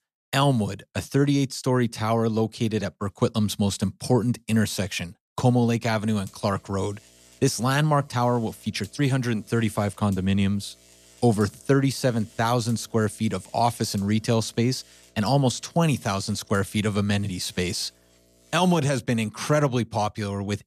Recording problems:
electrical hum; faint; from 6 to 19 s; 60 Hz, 25 dB below the speech

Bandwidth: 14 kHz